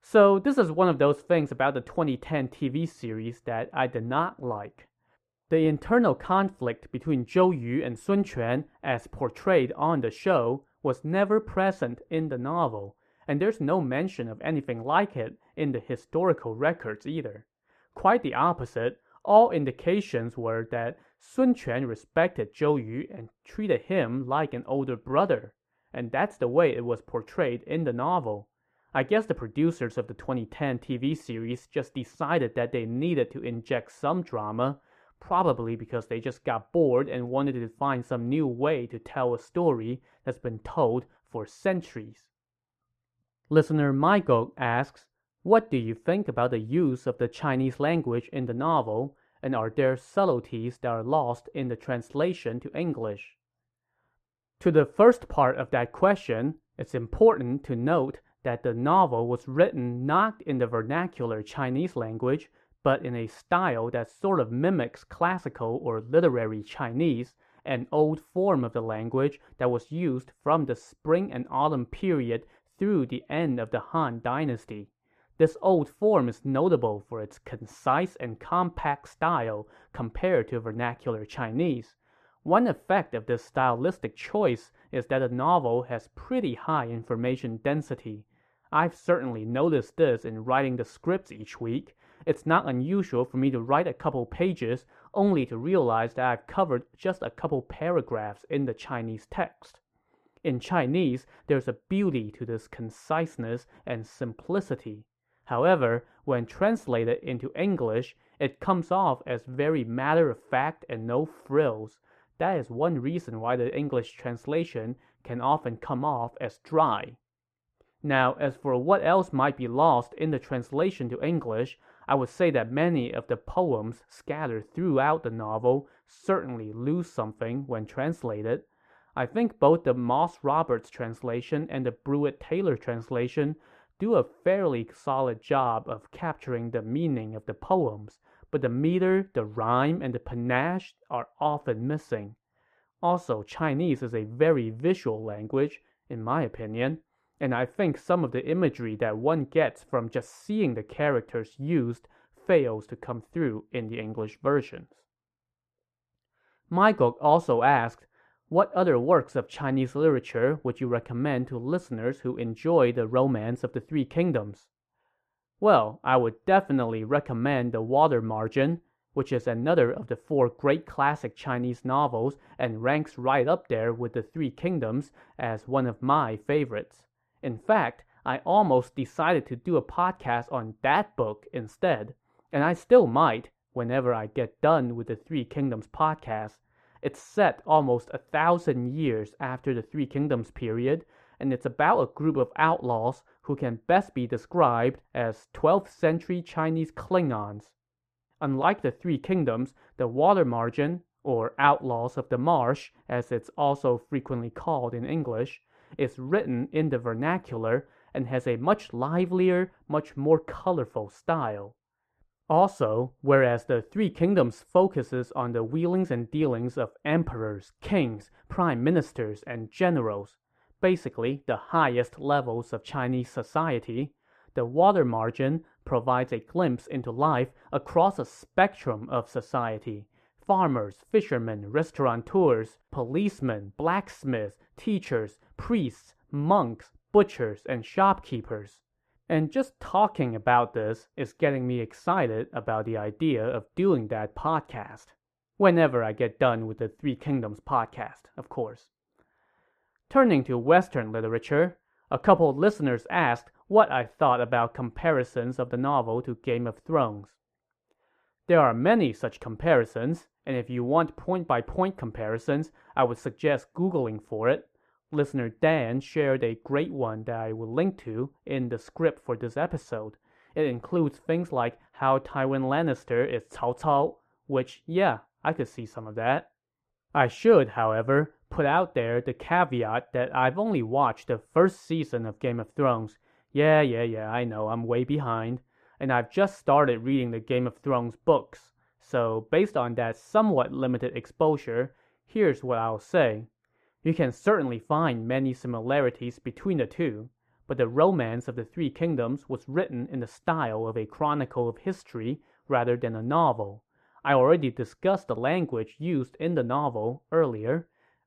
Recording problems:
muffled; very; fading above 2.5 kHz

